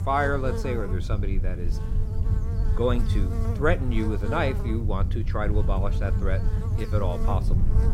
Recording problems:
electrical hum; noticeable; throughout; 60 Hz, 10 dB below the speech
low rumble; noticeable; throughout; 15 dB below the speech

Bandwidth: 16 kHz